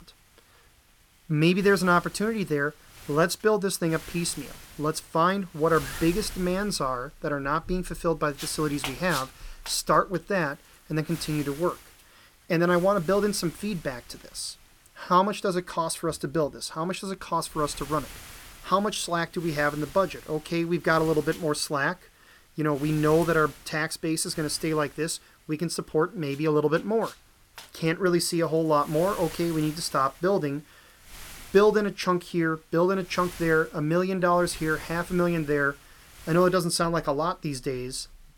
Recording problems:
wind noise on the microphone; occasional gusts; 20 dB below the speech

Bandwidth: 18 kHz